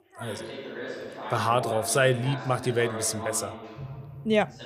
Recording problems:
background chatter; noticeable; throughout; 2 voices, 10 dB below the speech

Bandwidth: 15 kHz